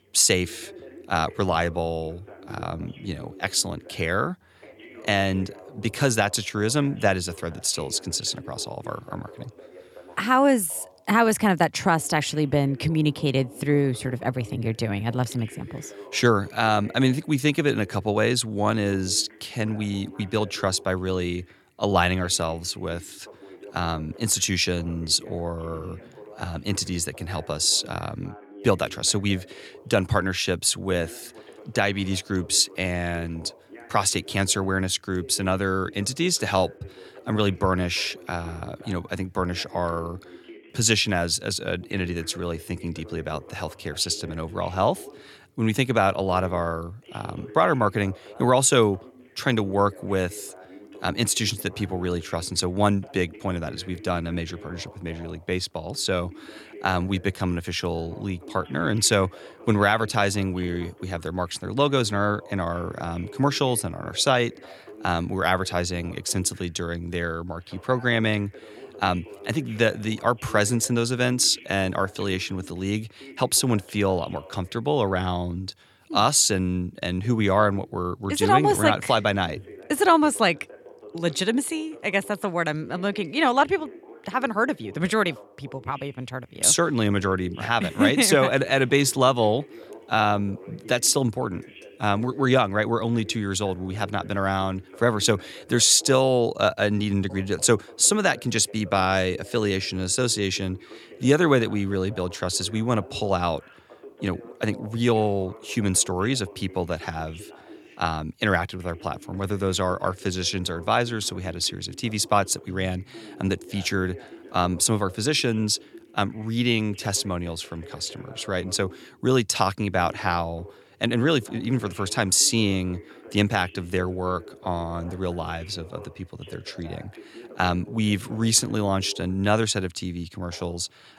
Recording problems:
voice in the background; faint; throughout; 20 dB below the speech

